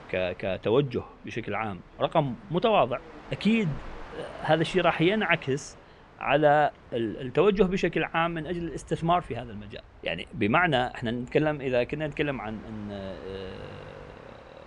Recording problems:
train or aircraft noise; faint; throughout; 20 dB below the speech

